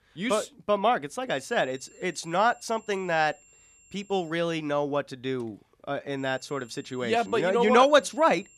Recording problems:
high-pitched whine; faint; from 1.5 to 4.5 s and from 6 s on; 7.5 kHz, 30 dB below the speech

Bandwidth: 14.5 kHz